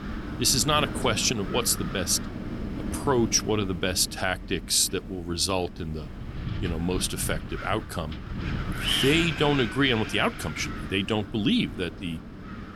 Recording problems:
wind noise on the microphone; heavy; 9 dB below the speech

